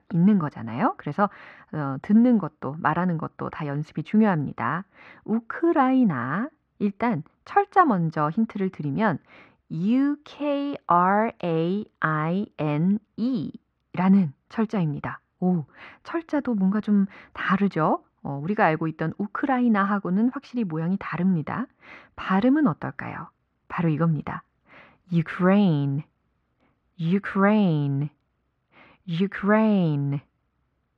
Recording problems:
muffled; very; fading above 2 kHz

